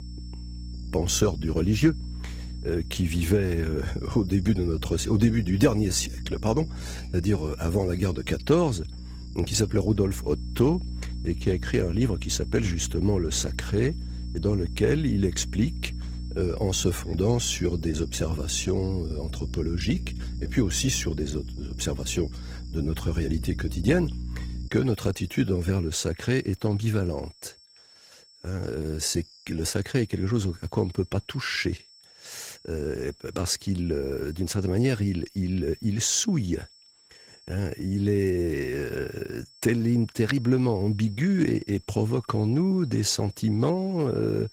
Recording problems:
garbled, watery; slightly; nothing above 16.5 kHz
electrical hum; noticeable; until 25 s; 60 Hz, 20 dB below the speech
high-pitched whine; faint; throughout; 5.5 kHz, 25 dB below the speech

